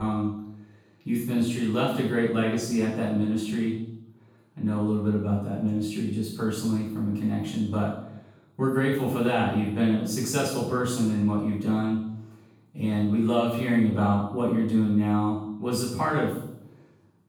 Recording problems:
off-mic speech; far
room echo; noticeable; dies away in 0.7 s
abrupt cut into speech; at the start

